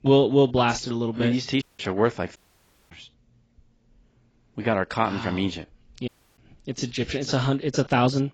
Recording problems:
garbled, watery; badly; nothing above 7.5 kHz
audio cutting out; at 1.5 s, at 2.5 s for 0.5 s and at 6 s

